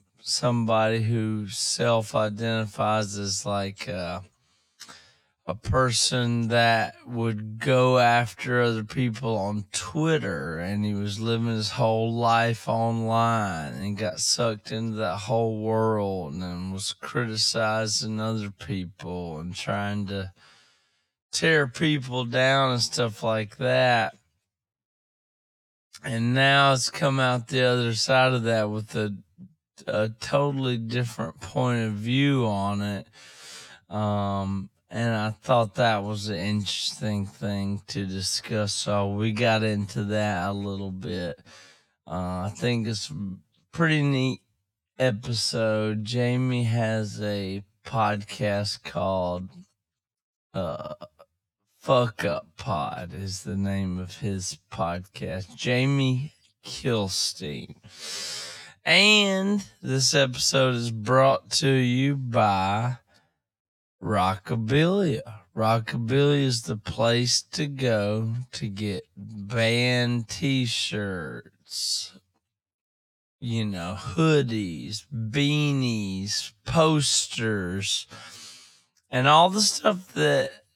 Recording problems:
wrong speed, natural pitch; too slow; 0.5 times normal speed

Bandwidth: 18 kHz